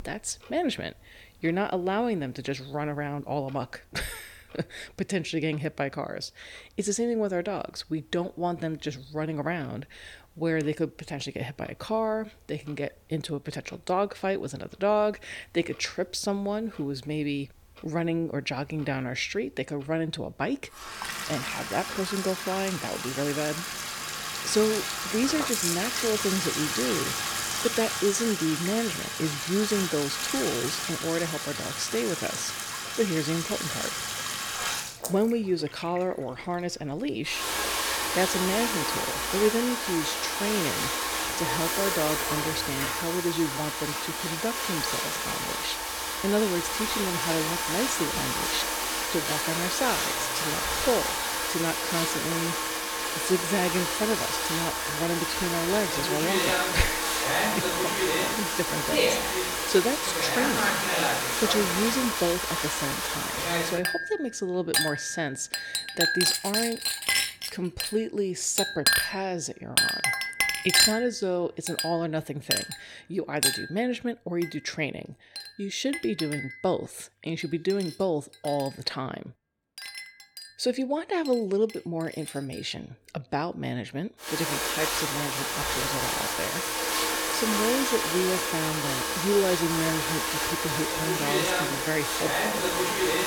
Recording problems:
household noises; very loud; throughout; 3 dB above the speech

